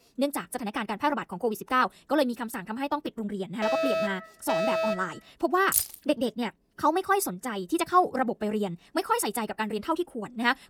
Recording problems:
wrong speed, natural pitch; too fast; 1.7 times normal speed
alarm; loud; from 3.5 to 5 s; peak 2 dB above the speech
jangling keys; loud; at 5.5 s; peak 3 dB above the speech

